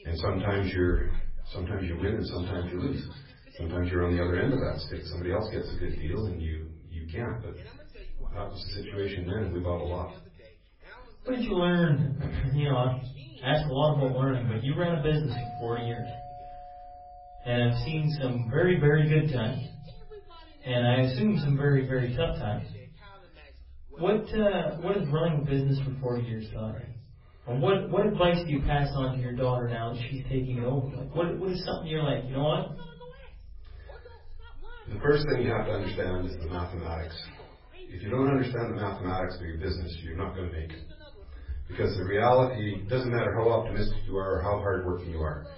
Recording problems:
off-mic speech; far
garbled, watery; badly; nothing above 5.5 kHz
room echo; slight; dies away in 0.5 s
voice in the background; faint; throughout; 25 dB below the speech
doorbell; faint; from 15 to 19 s; peak 10 dB below the speech

